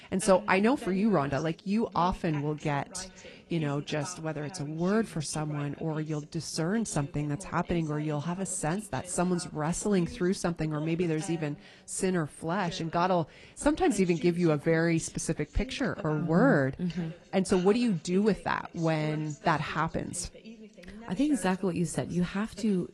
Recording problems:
garbled, watery; slightly
voice in the background; noticeable; throughout; 20 dB below the speech

